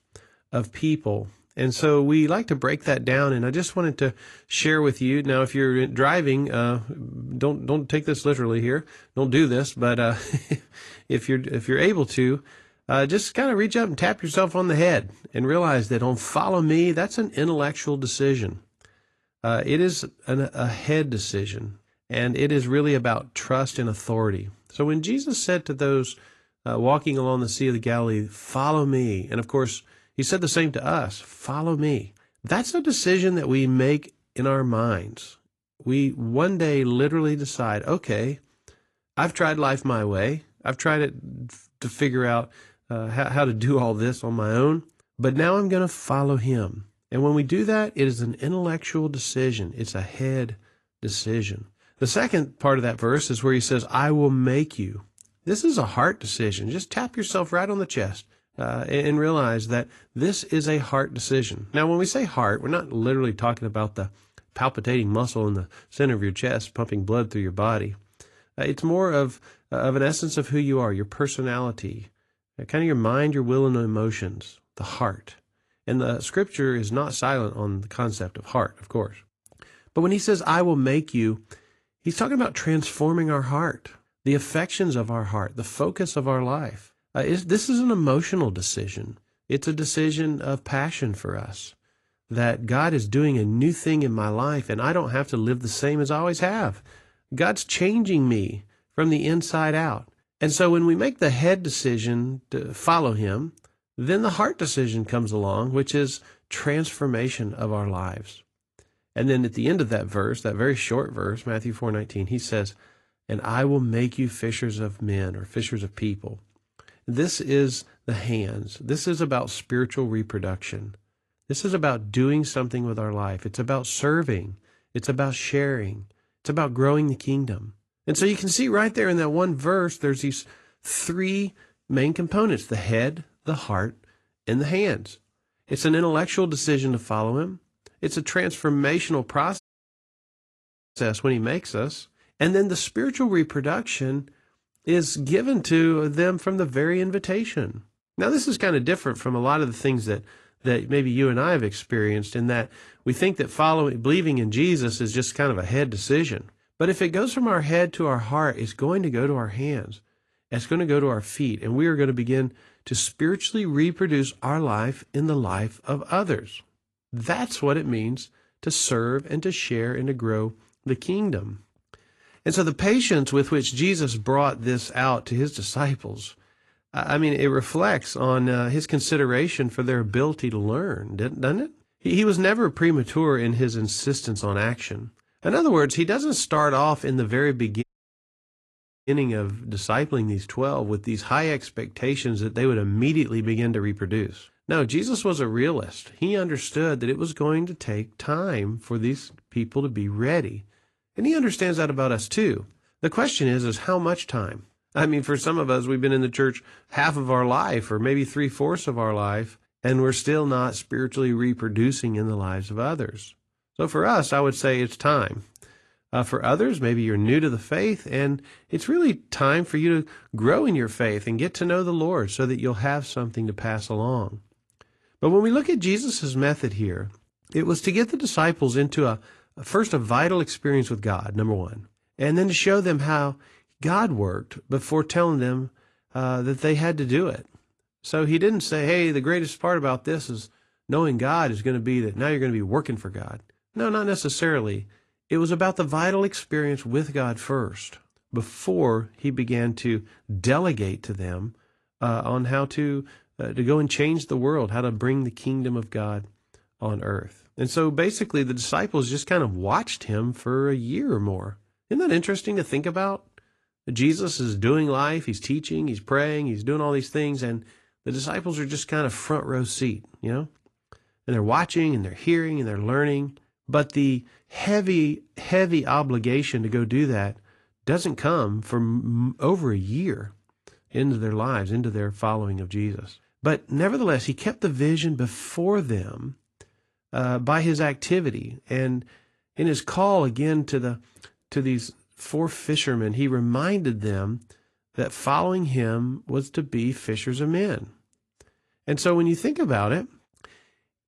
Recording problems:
garbled, watery; slightly; nothing above 11 kHz
audio cutting out; at 2:20 for 1.5 s and at 3:08 for 1 s

